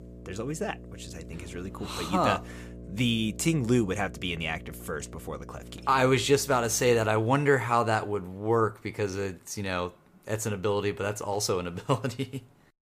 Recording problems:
electrical hum; faint; until 7 s; 60 Hz, 25 dB below the speech

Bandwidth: 15 kHz